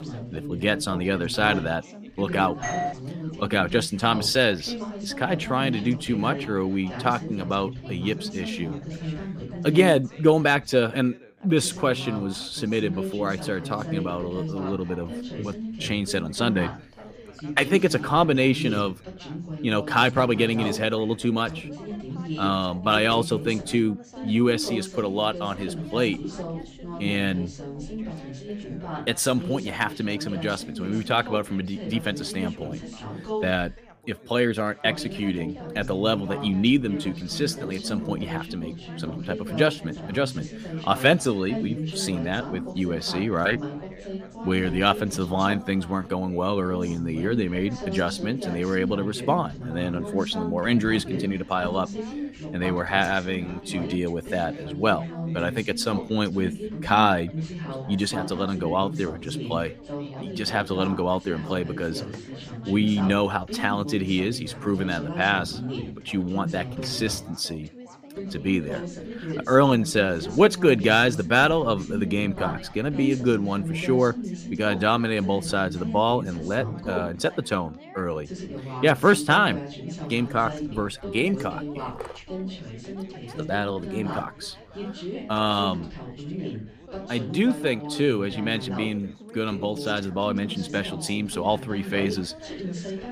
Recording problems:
background chatter; loud; throughout; 4 voices, 10 dB below the speech
doorbell; noticeable; at 2.5 s; peak 4 dB below the speech

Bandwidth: 15 kHz